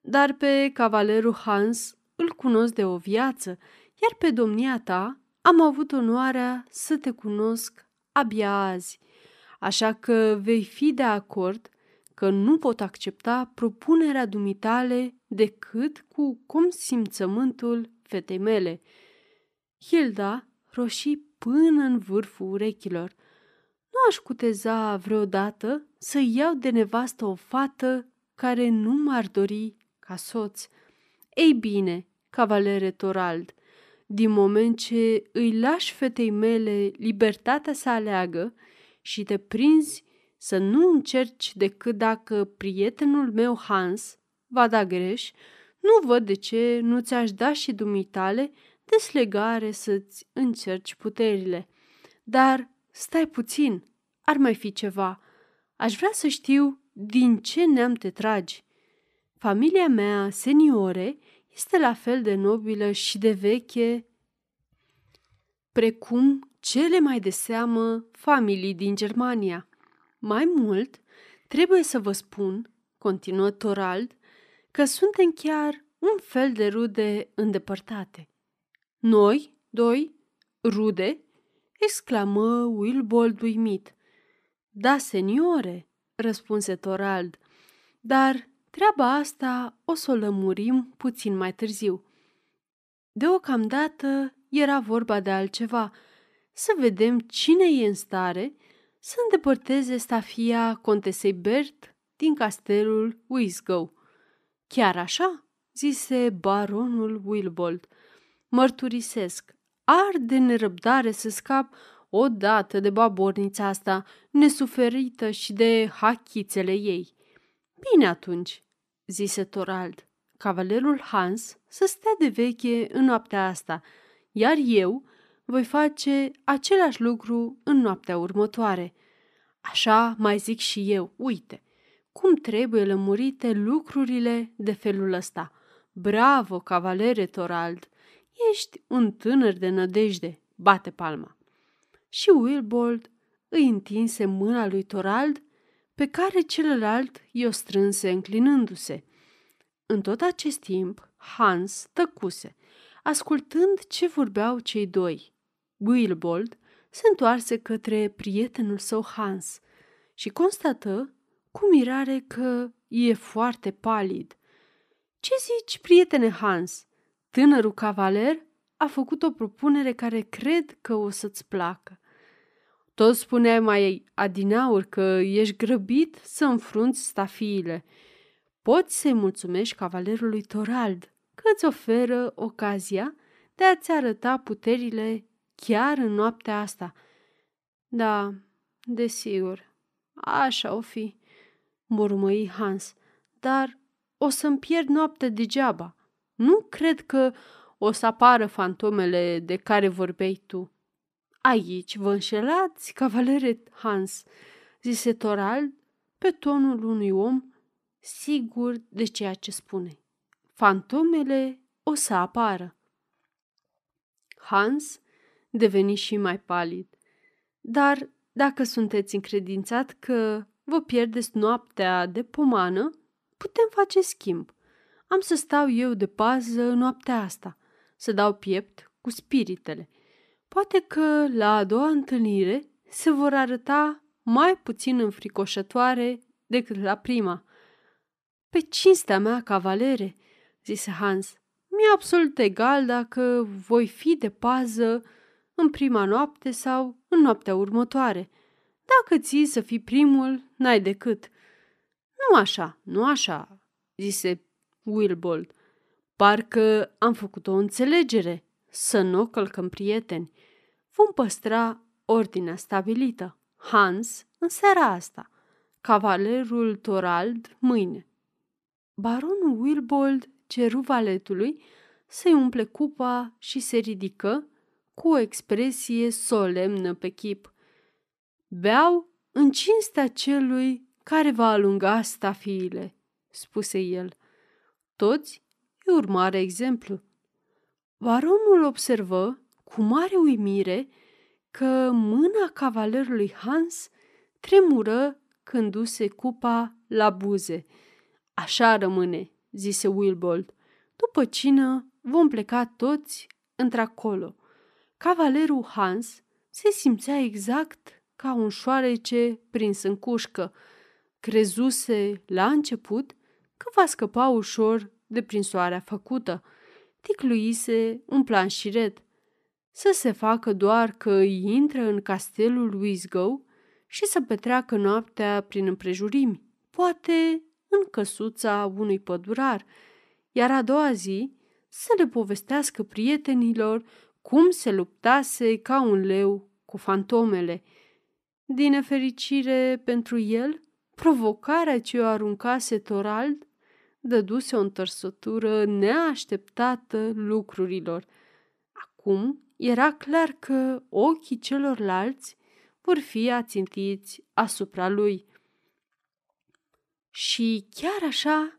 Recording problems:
none

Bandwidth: 14.5 kHz